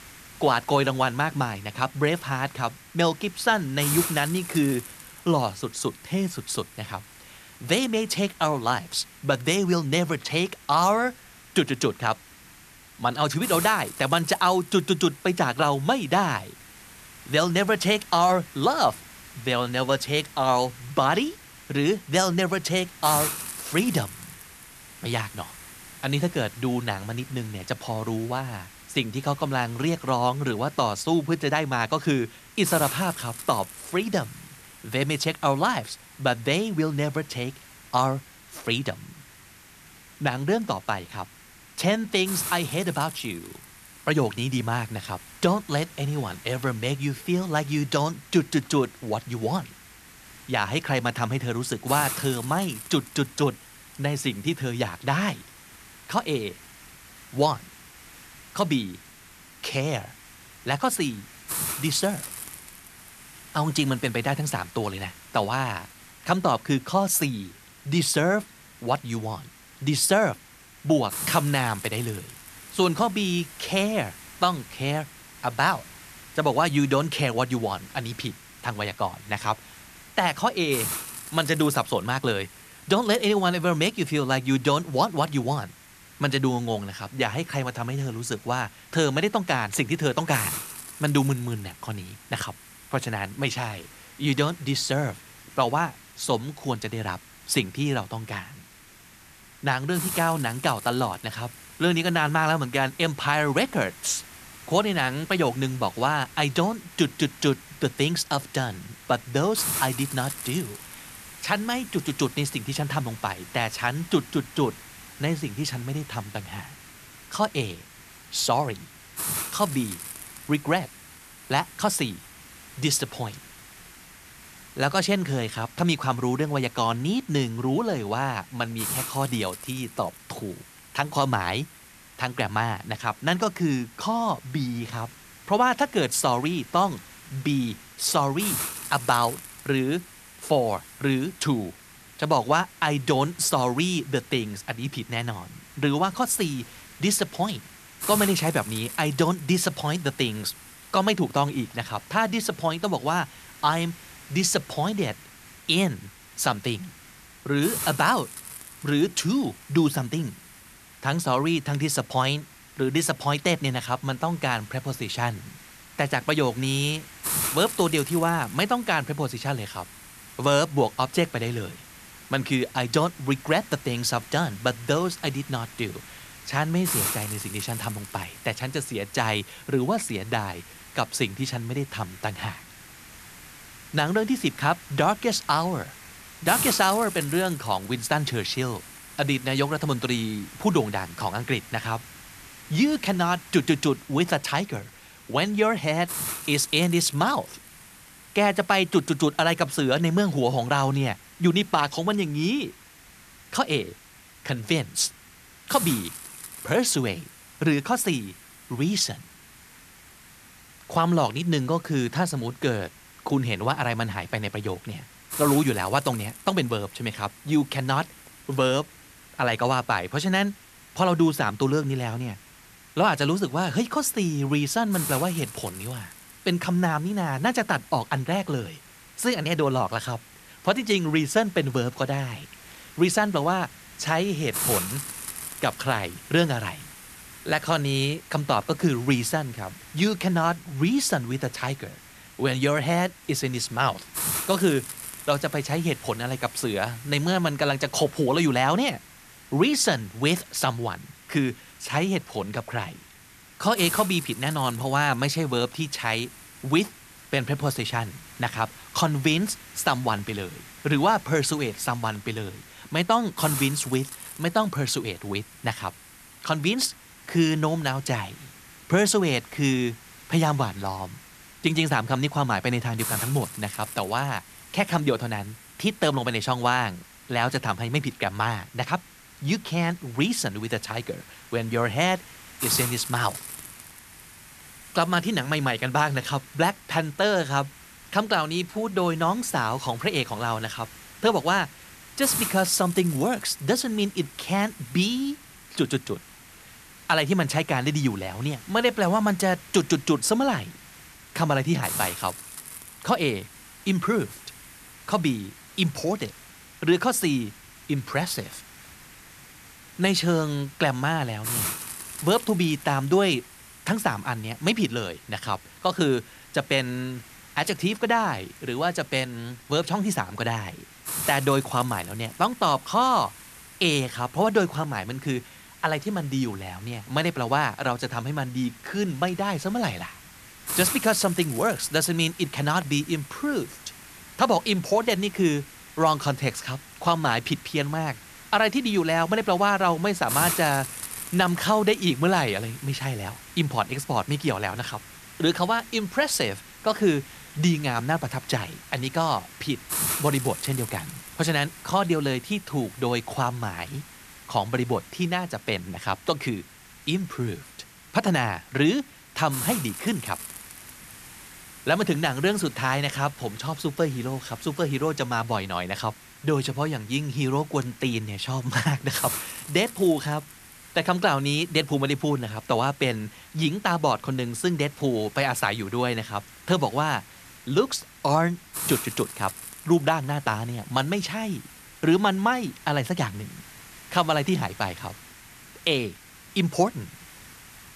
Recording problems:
hiss; noticeable; throughout; 15 dB below the speech

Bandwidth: 14 kHz